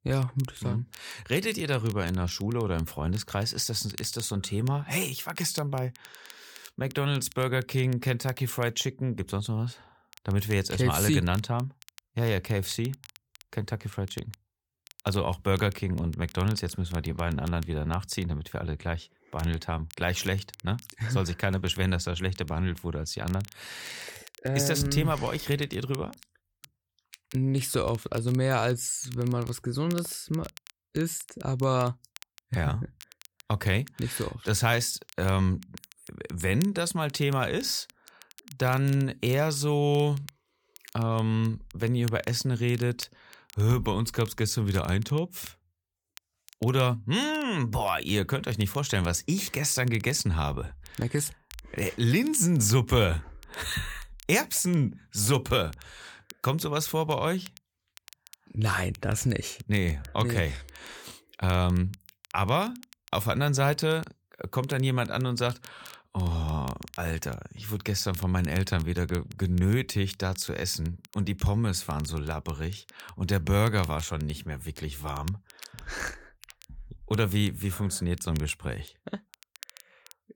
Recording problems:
crackle, like an old record; faint; 20 dB below the speech

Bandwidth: 18.5 kHz